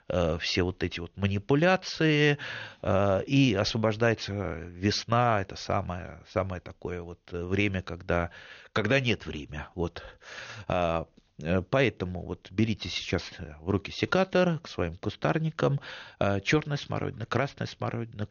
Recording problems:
high frequencies cut off; noticeable; nothing above 6.5 kHz

